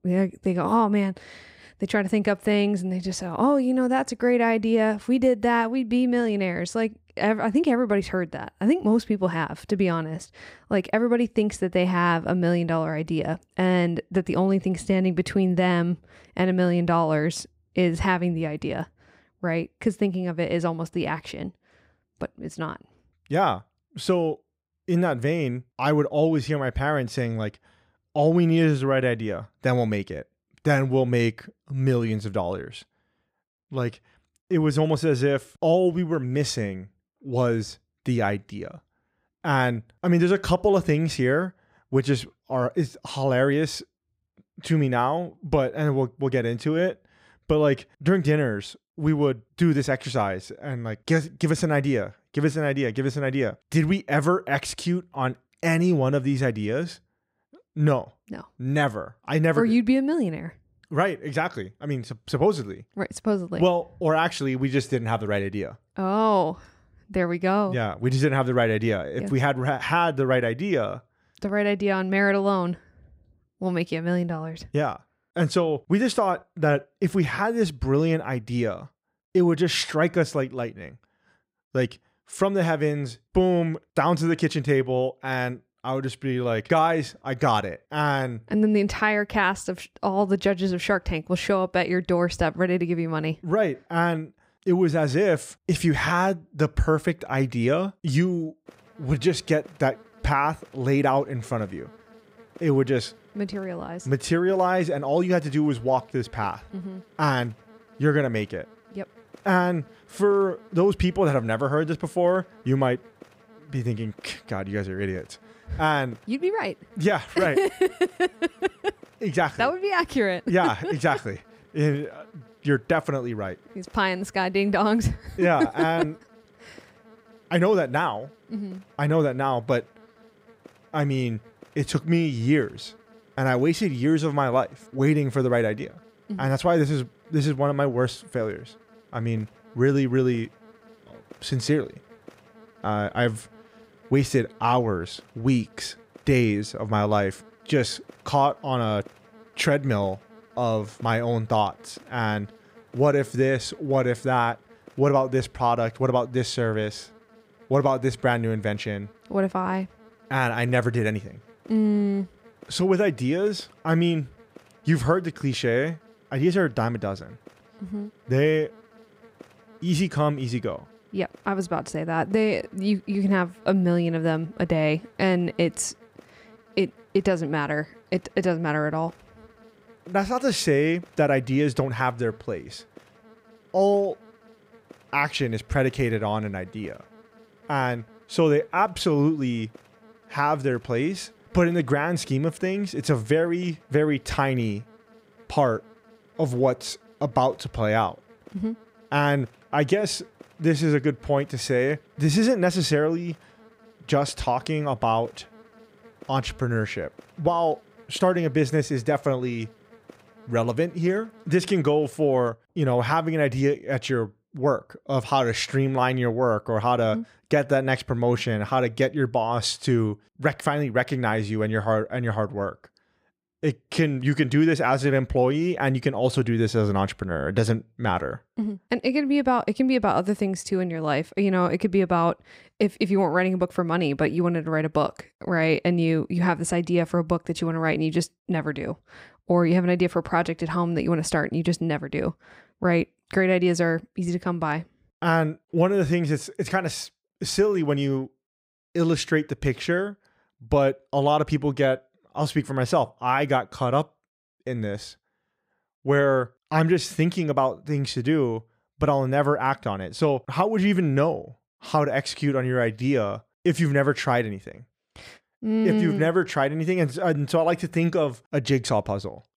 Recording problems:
electrical hum; faint; from 1:39 to 3:33; 60 Hz, 30 dB below the speech

